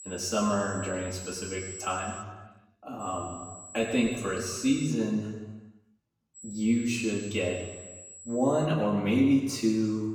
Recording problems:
off-mic speech; far
room echo; noticeable; dies away in 1.3 s
high-pitched whine; noticeable; until 2 s, from 3 to 5 s and from 6.5 to 8.5 s; 7.5 kHz, 15 dB below the speech

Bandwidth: 17.5 kHz